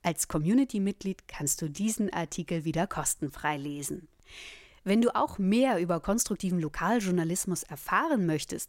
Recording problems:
uneven, jittery; strongly; from 1 to 7 s

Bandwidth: 16 kHz